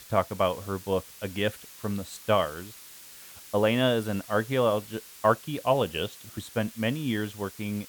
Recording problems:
hiss; noticeable; throughout; 15 dB below the speech

